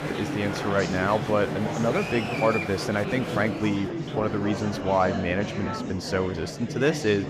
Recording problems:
murmuring crowd; loud; throughout; 4 dB below the speech

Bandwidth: 15 kHz